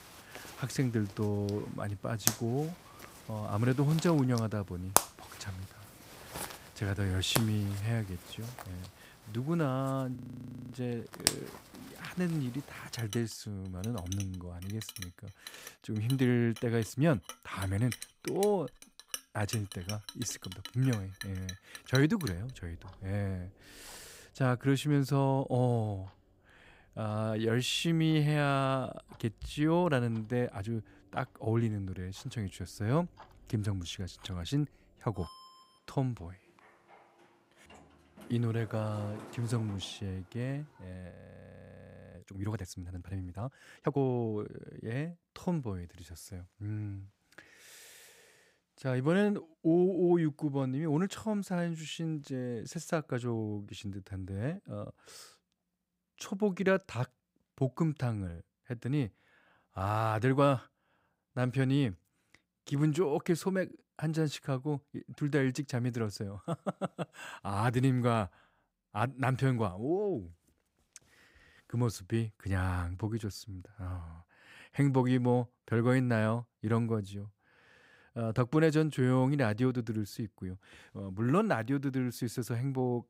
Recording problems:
household noises; loud; until 41 s; 8 dB below the speech
audio freezing; at 10 s for 0.5 s and at 41 s for 1 s

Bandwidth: 15.5 kHz